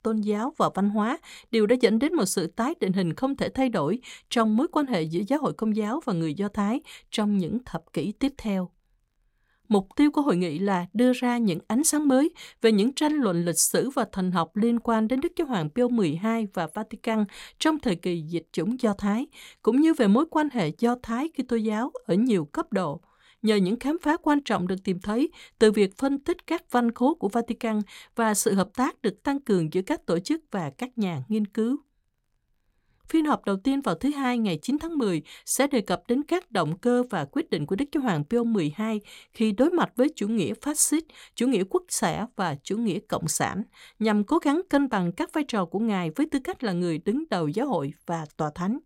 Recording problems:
none

